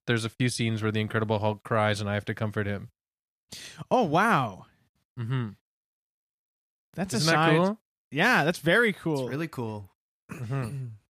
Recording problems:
none

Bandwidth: 14.5 kHz